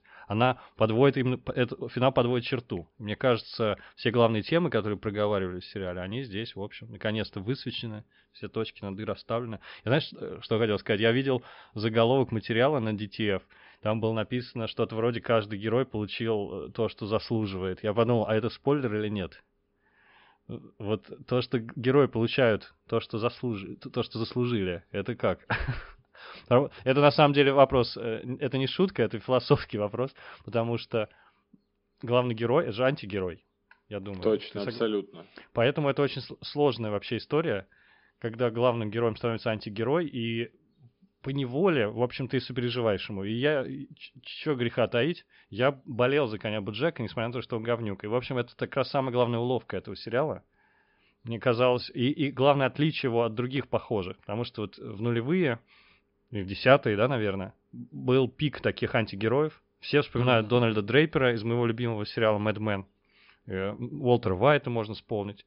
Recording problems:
high frequencies cut off; noticeable; nothing above 5 kHz

